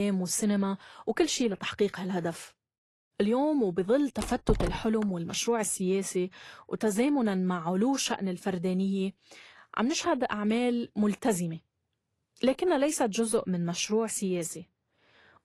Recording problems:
garbled, watery; slightly; nothing above 11.5 kHz
abrupt cut into speech; at the start
door banging; noticeable; at 4 s; peak 4 dB below the speech

